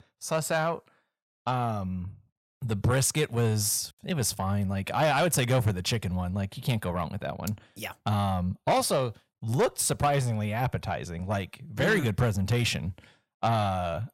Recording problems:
distortion; slight; 10 dB below the speech

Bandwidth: 16 kHz